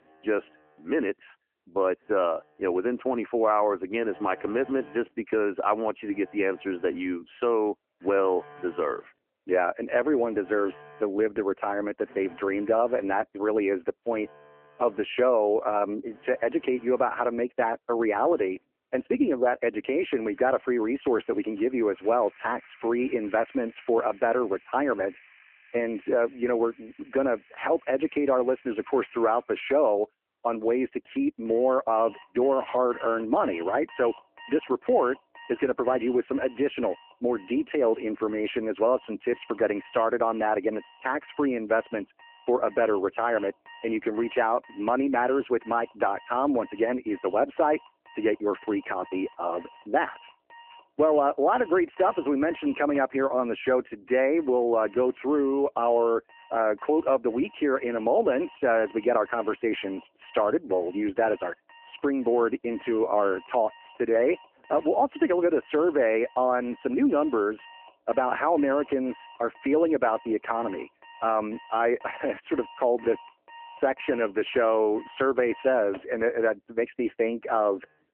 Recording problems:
phone-call audio
alarms or sirens; faint; throughout; 25 dB below the speech

